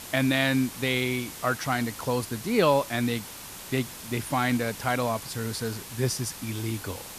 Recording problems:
hiss; noticeable; throughout; 10 dB below the speech

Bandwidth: 14.5 kHz